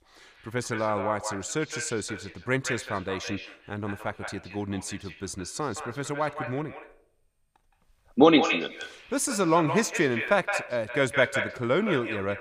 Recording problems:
echo of what is said; strong; throughout; 170 ms later, 7 dB below the speech

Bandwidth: 15 kHz